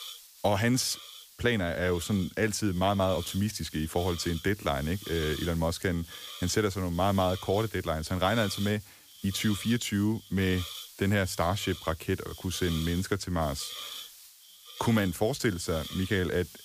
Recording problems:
hiss; noticeable; throughout; 15 dB below the speech

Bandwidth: 15 kHz